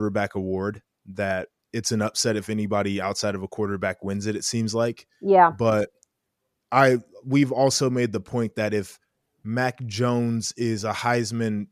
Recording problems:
abrupt cut into speech; at the start

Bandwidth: 14.5 kHz